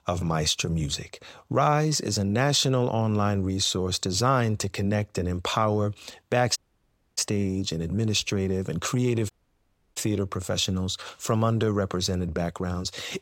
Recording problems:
audio cutting out; at 6.5 s for 0.5 s and at 9.5 s for 0.5 s

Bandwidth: 16 kHz